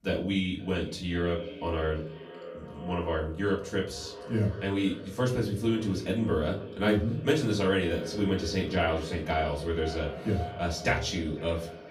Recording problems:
off-mic speech; far
echo of what is said; noticeable; throughout; 500 ms later, 15 dB below the speech
room echo; slight; dies away in 0.3 s

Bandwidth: 15.5 kHz